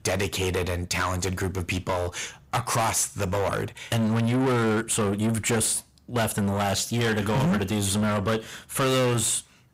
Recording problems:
distortion; heavy; 6 dB below the speech

